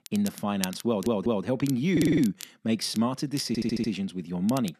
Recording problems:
crackle, like an old record; noticeable; 15 dB below the speech
audio stuttering; at 1 s, at 2 s and at 3.5 s

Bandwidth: 13.5 kHz